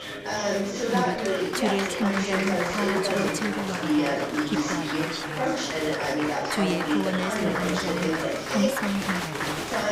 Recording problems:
chatter from many people; very loud; throughout; 4 dB above the speech

